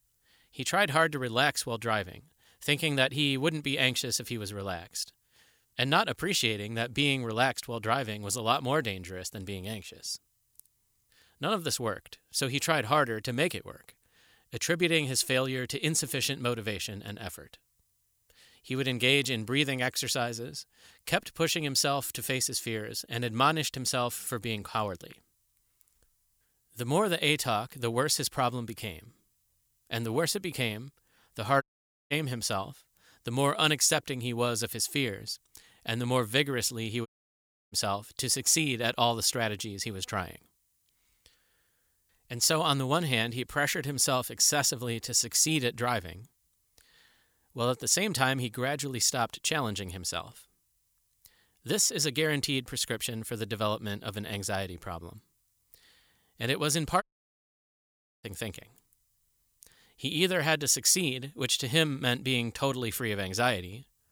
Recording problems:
audio cutting out; at 32 s, at 37 s for 0.5 s and at 57 s for 1 s

